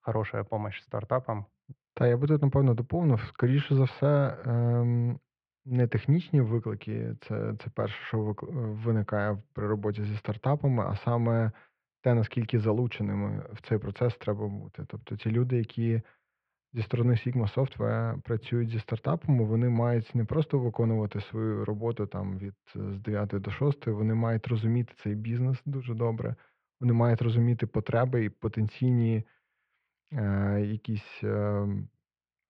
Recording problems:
muffled; very; fading above 2.5 kHz

